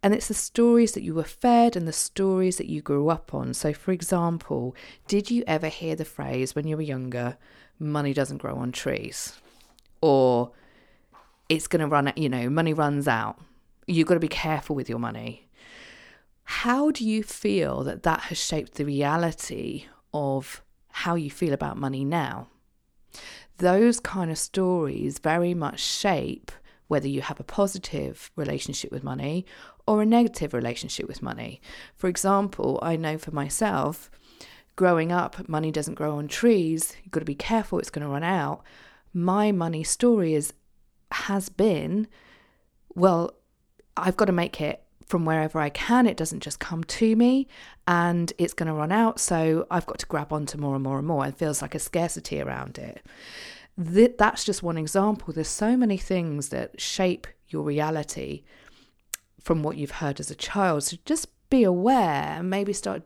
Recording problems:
none

